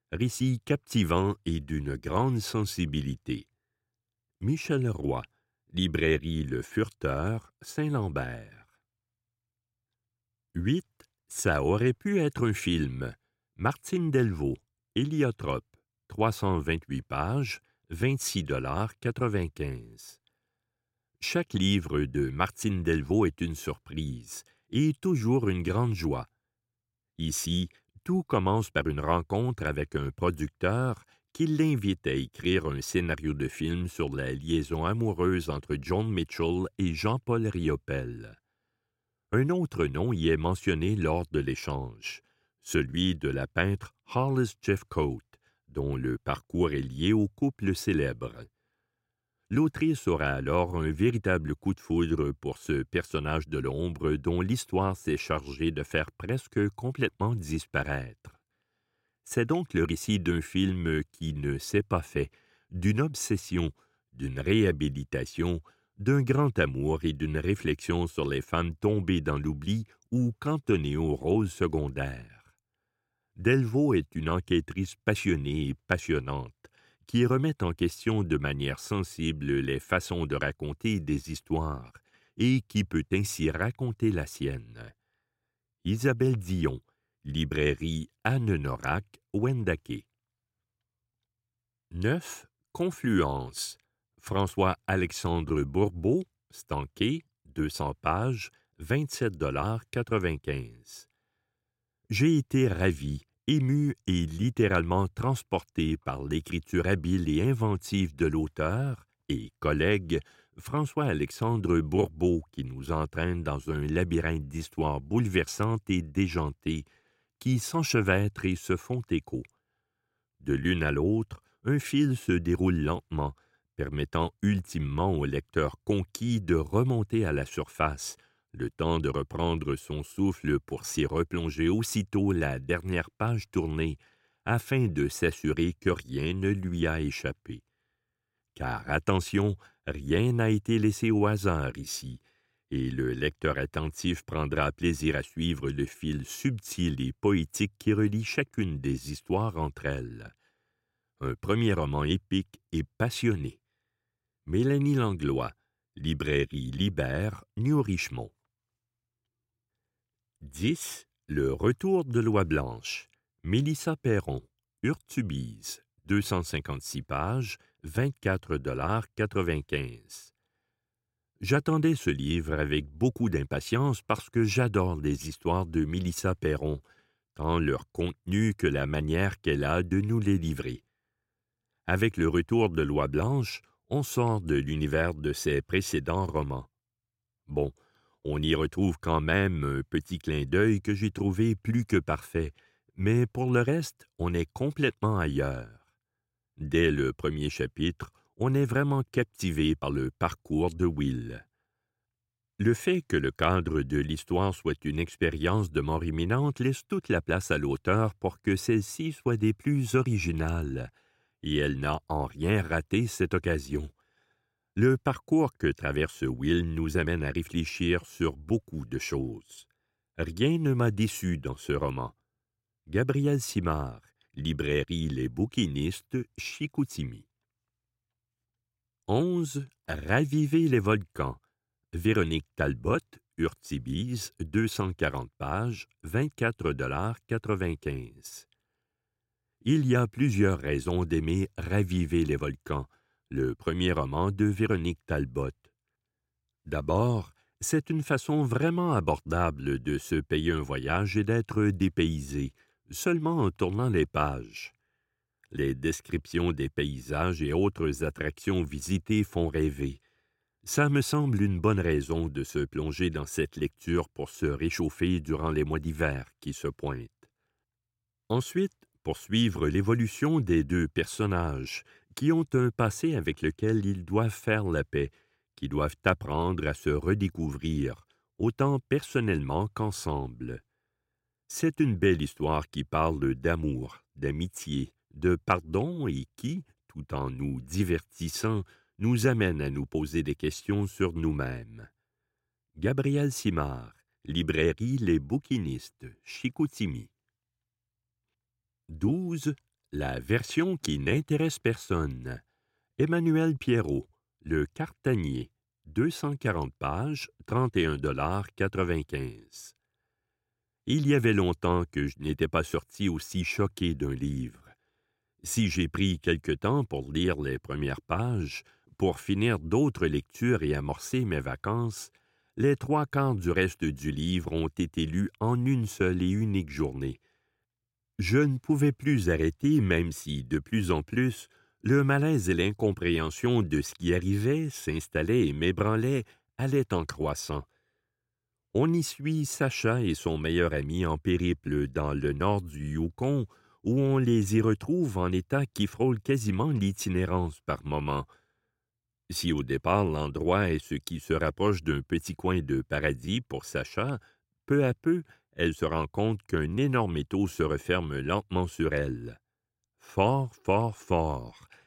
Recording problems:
none

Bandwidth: 16 kHz